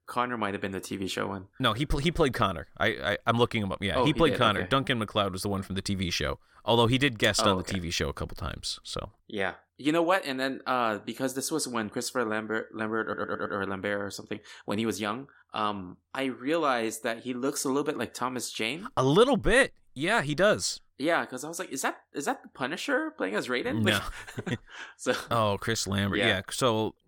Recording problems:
audio stuttering; at 13 s

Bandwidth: 17 kHz